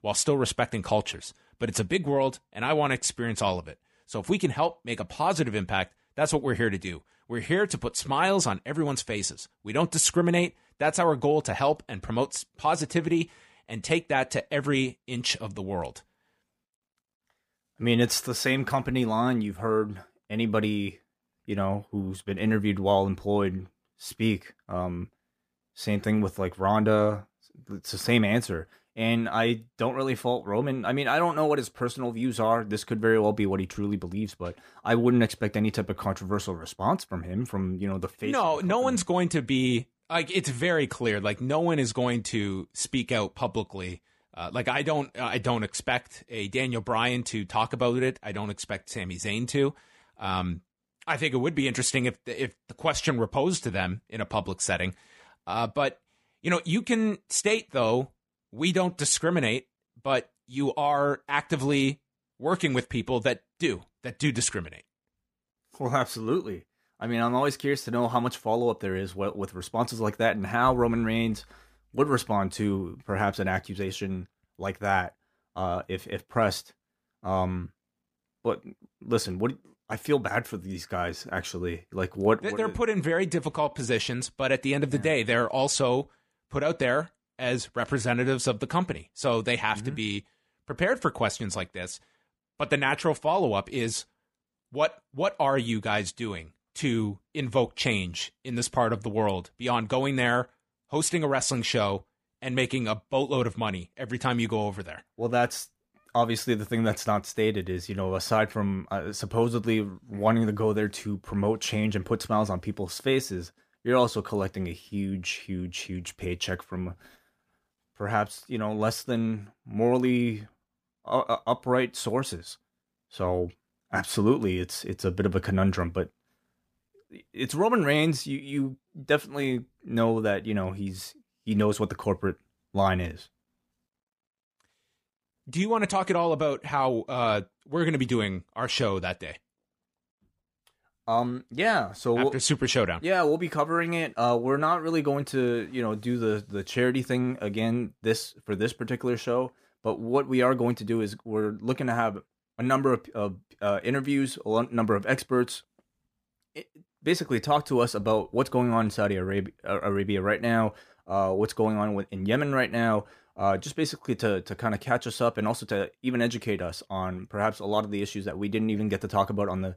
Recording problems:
none

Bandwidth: 15 kHz